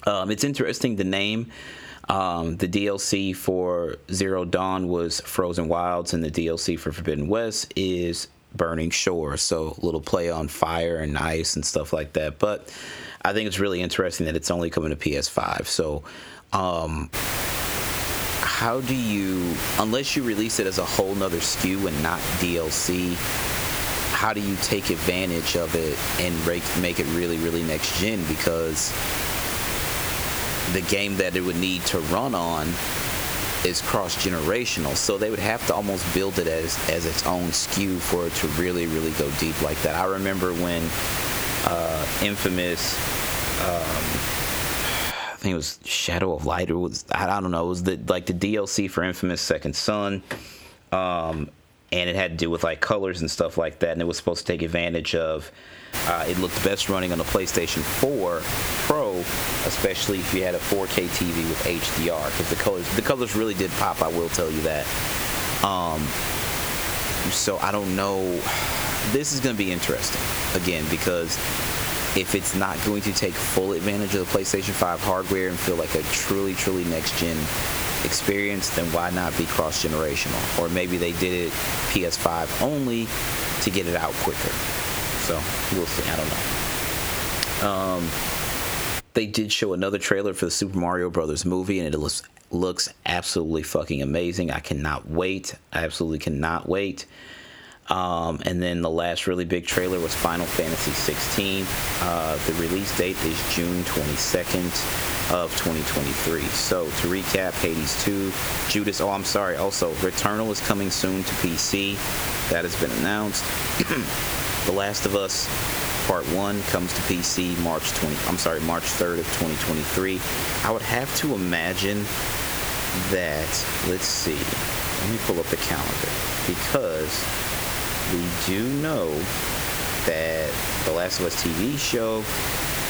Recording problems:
squashed, flat; heavily
hiss; loud; from 17 to 45 s, from 56 s to 1:29 and from 1:40 on; 2 dB below the speech

